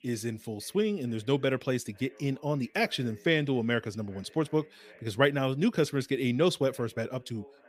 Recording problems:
background chatter; faint; throughout; 2 voices, 30 dB below the speech

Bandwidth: 15 kHz